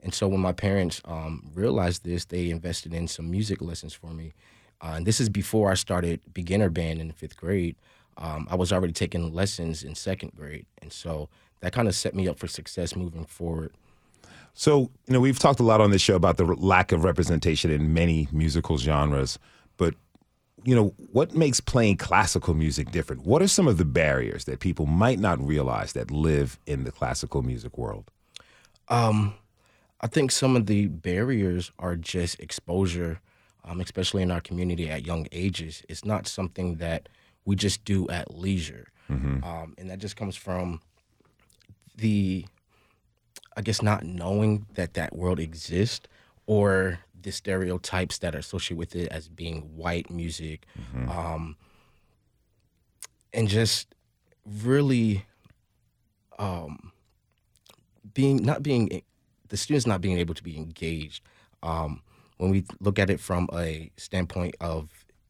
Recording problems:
none

